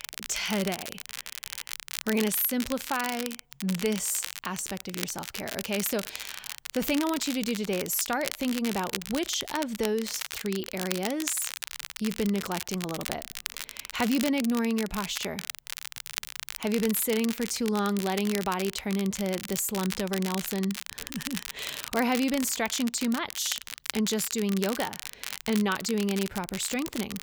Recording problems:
crackle, like an old record; loud; 7 dB below the speech

